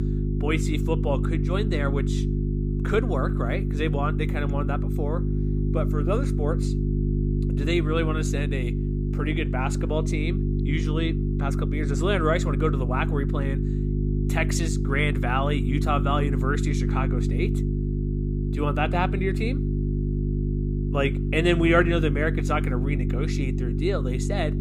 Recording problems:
electrical hum; loud; throughout; 50 Hz, 7 dB below the speech

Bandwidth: 15.5 kHz